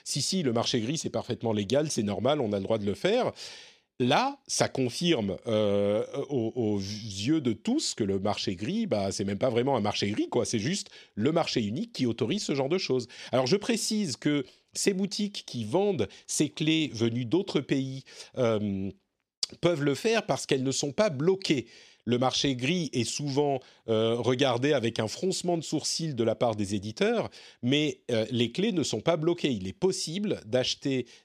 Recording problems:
none

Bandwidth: 14 kHz